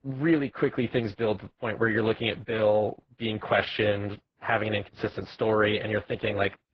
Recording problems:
garbled, watery; badly
muffled; very; fading above 2 kHz

